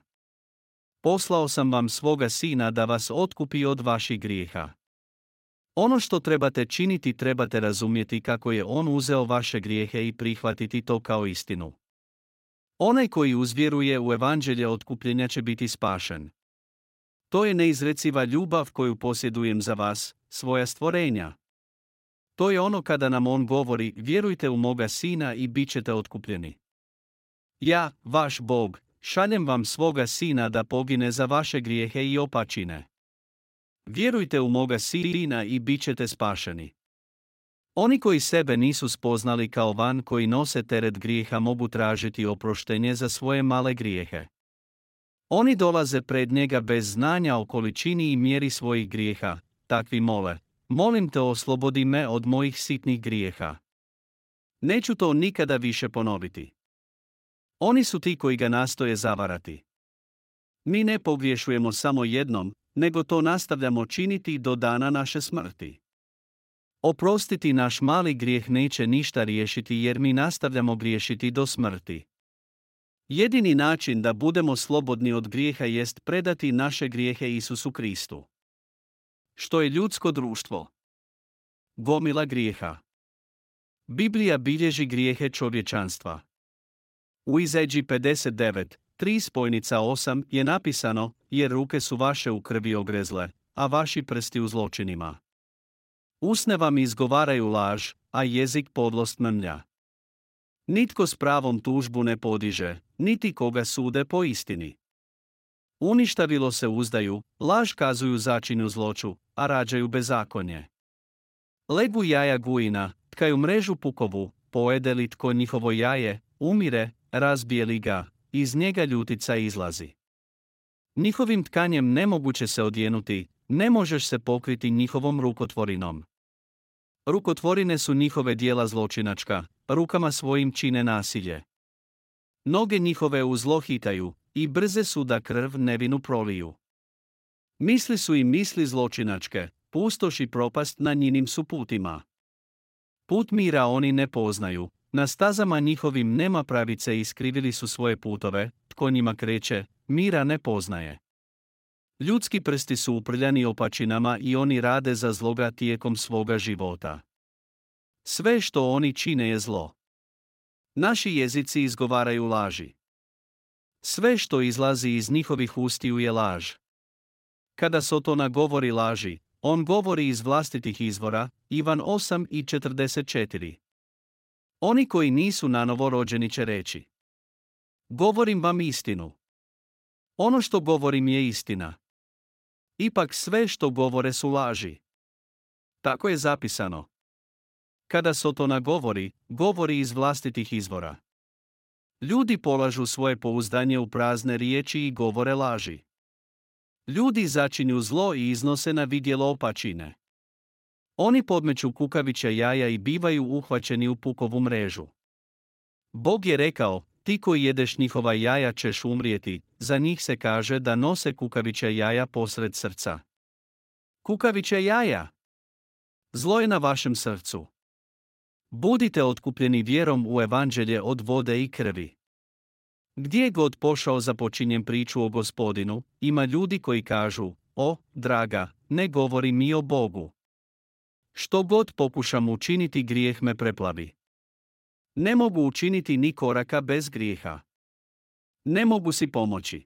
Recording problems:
audio stuttering; at 35 s

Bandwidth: 16 kHz